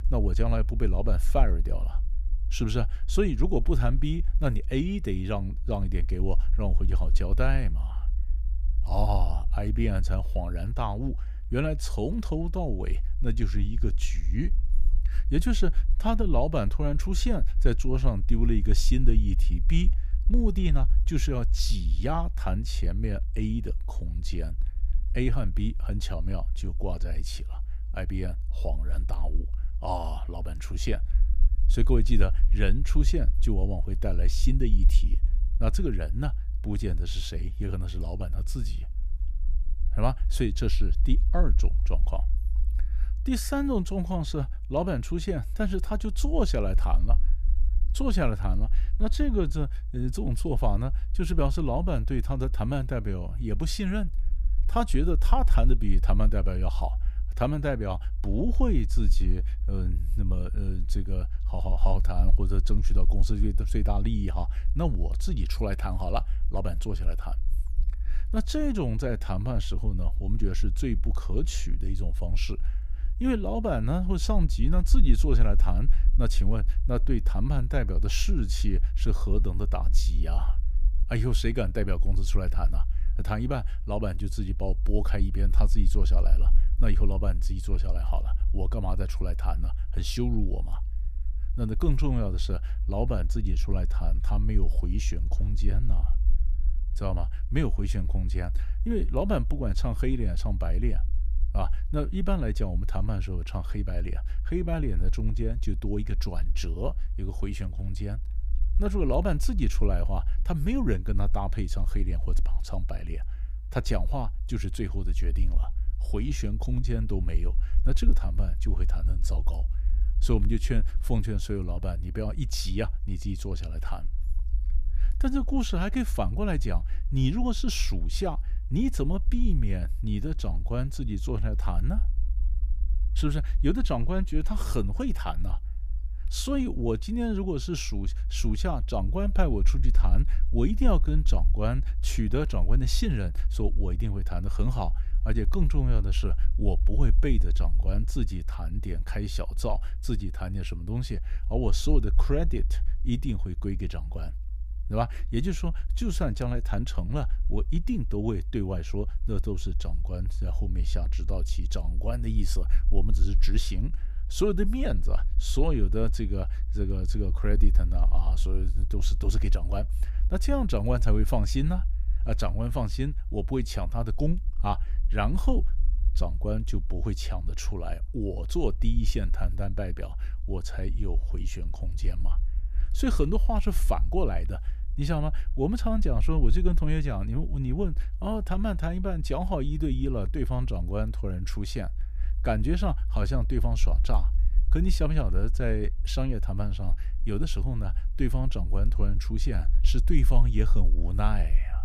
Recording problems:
low rumble; noticeable; throughout; 20 dB below the speech

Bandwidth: 15 kHz